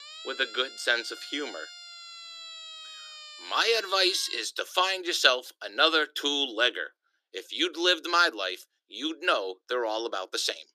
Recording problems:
thin; very; fading below 350 Hz
siren; faint; until 4.5 s; peak 15 dB below the speech

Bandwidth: 14.5 kHz